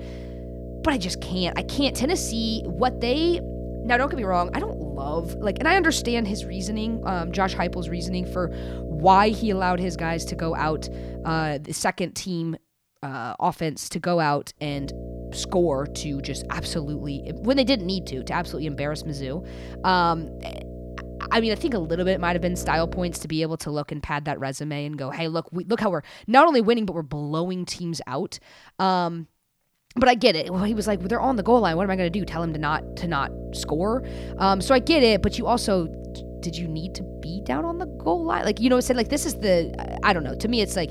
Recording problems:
electrical hum; noticeable; until 12 s, from 15 to 23 s and from 31 s on; 60 Hz, 15 dB below the speech

